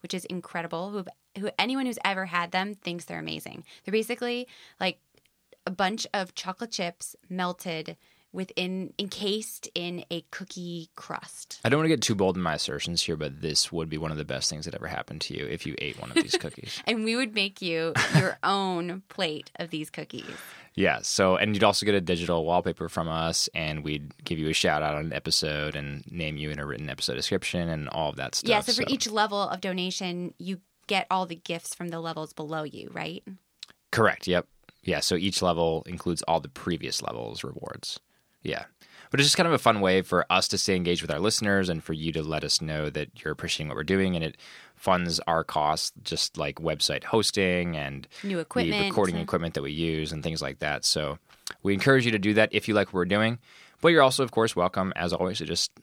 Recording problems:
none

